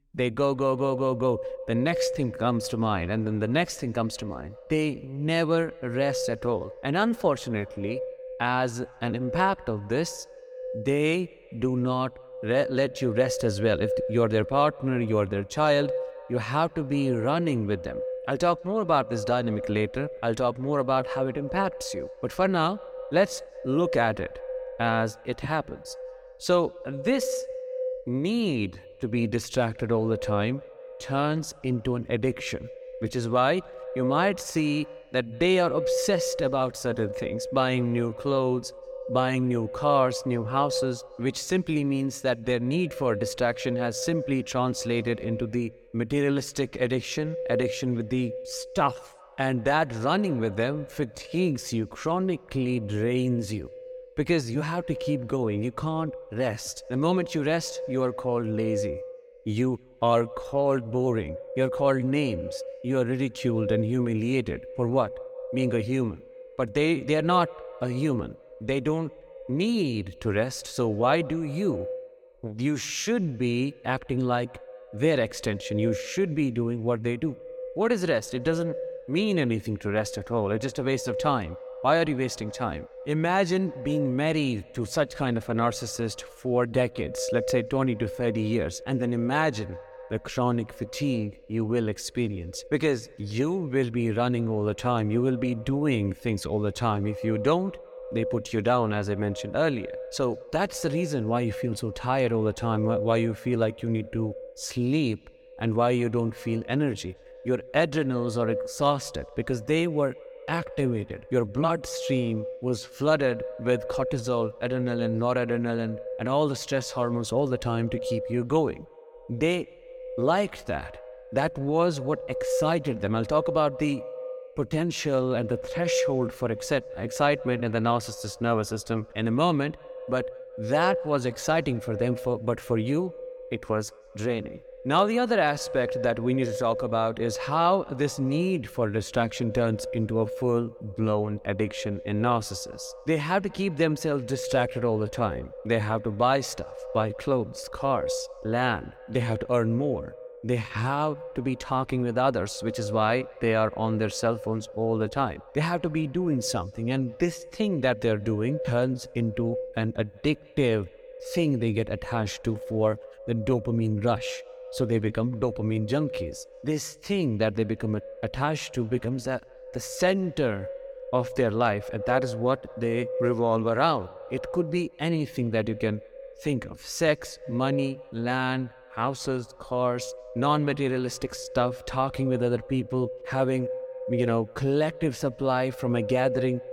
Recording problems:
echo of what is said; strong; throughout; 180 ms later, 10 dB below the speech

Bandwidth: 17.5 kHz